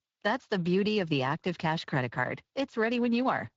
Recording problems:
garbled, watery; slightly; nothing above 7.5 kHz

